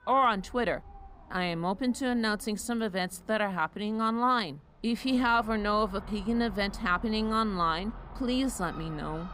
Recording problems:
animal sounds; noticeable; throughout; 20 dB below the speech

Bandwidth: 15.5 kHz